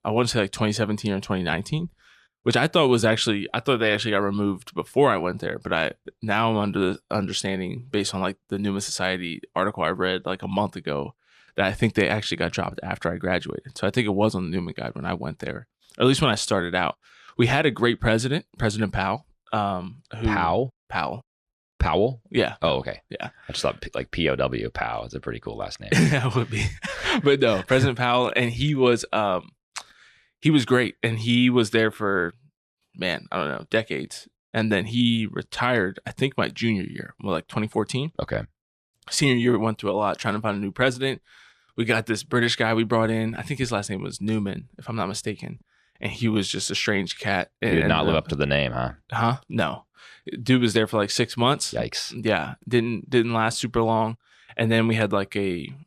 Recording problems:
none

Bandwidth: 14 kHz